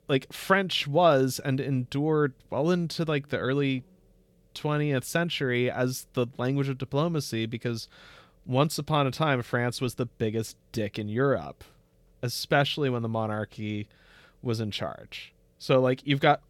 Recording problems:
none

